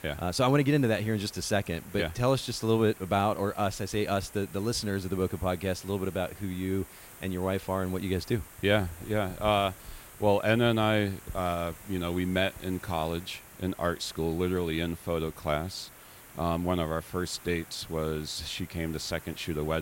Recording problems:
hiss; noticeable; throughout; 20 dB below the speech
abrupt cut into speech; at the end

